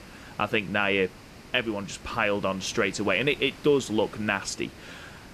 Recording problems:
hiss; noticeable; throughout; 20 dB below the speech

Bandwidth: 14 kHz